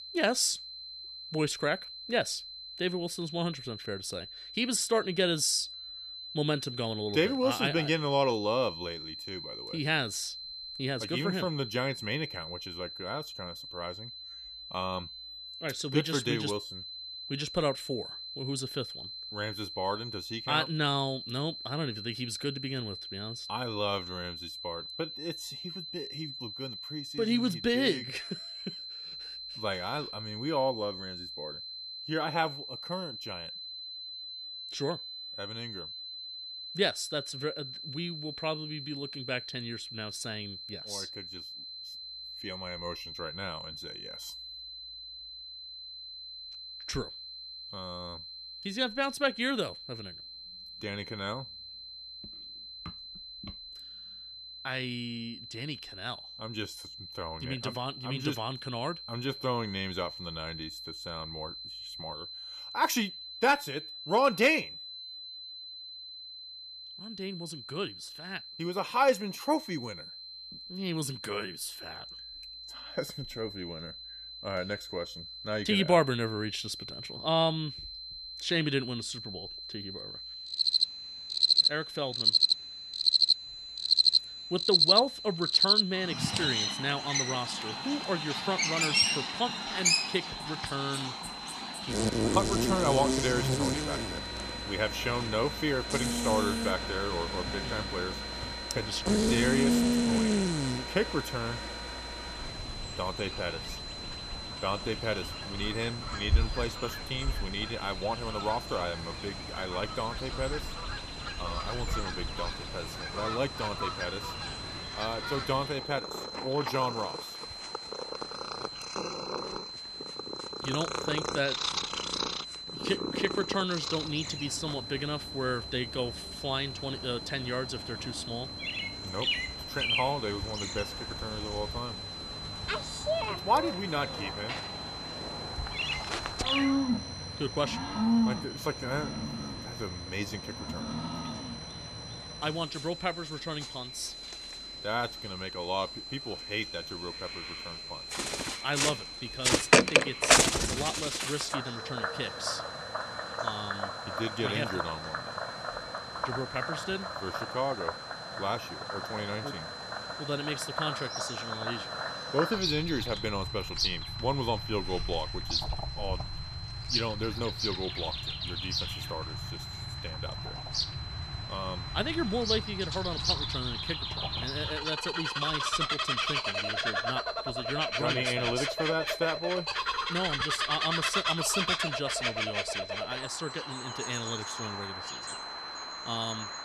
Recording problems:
animal sounds; very loud; from 1:21 on; 2 dB above the speech
high-pitched whine; loud; throughout; 4 kHz, 7 dB below the speech

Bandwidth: 14.5 kHz